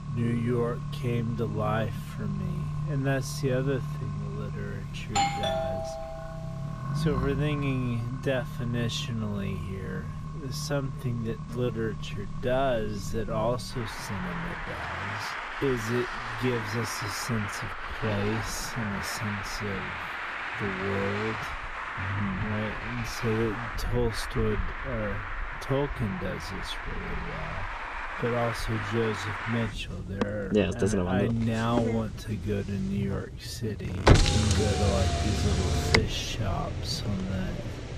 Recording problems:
wrong speed, natural pitch; too slow; 0.5 times normal speed
traffic noise; loud; throughout; 1 dB below the speech
doorbell; loud; from 5 to 6.5 s; peak 5 dB above the speech

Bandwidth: 14.5 kHz